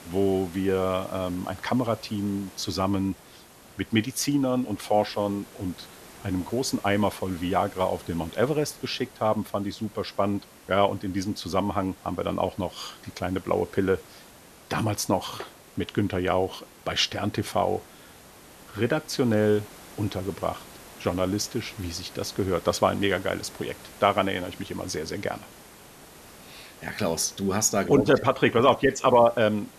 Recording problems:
hiss; faint; throughout; 20 dB below the speech

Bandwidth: 13.5 kHz